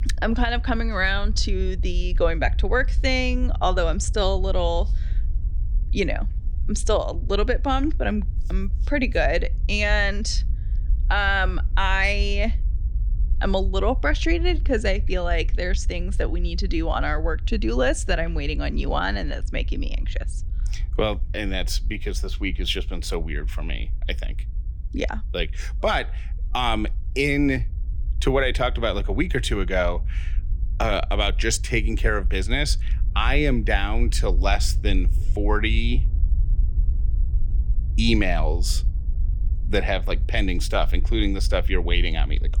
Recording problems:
low rumble; faint; throughout; 25 dB below the speech

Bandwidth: 18 kHz